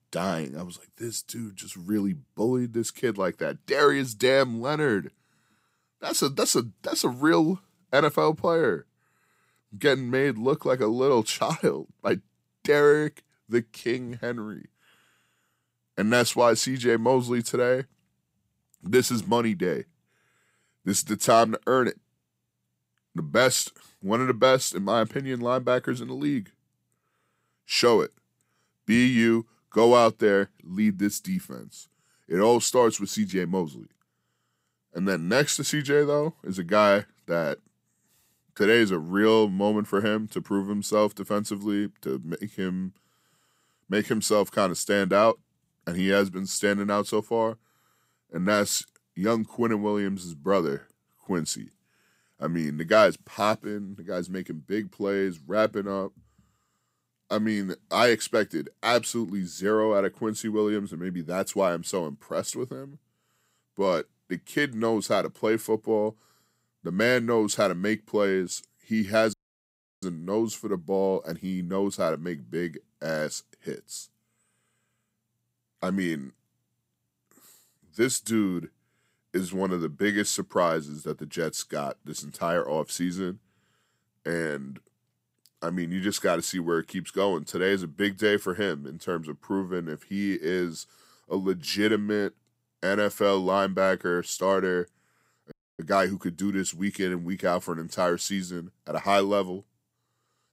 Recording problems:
audio cutting out; at 1:09 for 0.5 s and at 1:36

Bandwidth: 15.5 kHz